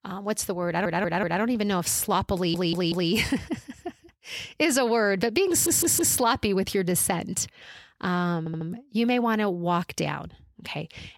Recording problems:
audio stuttering; 4 times, first at 0.5 s

